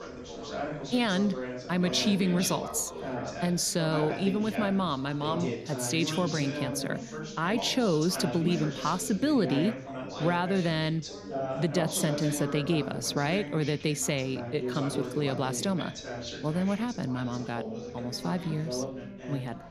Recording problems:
background chatter; loud; throughout; 3 voices, 7 dB below the speech

